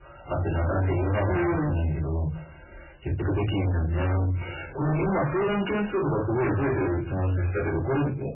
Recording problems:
distortion; heavy; 5 dB below the speech
off-mic speech; far
garbled, watery; badly; nothing above 3 kHz
room echo; very slight; dies away in 0.4 s
uneven, jittery; strongly; from 3 to 7 s

